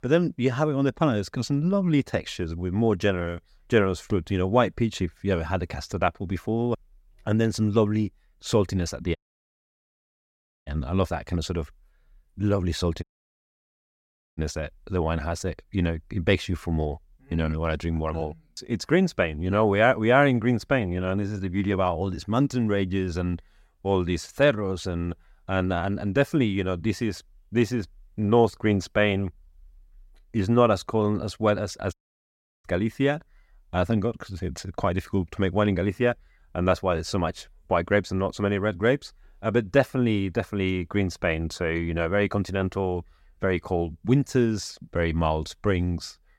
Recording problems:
audio cutting out; at 9 s for 1.5 s, at 13 s for 1.5 s and at 32 s for 0.5 s

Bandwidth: 16 kHz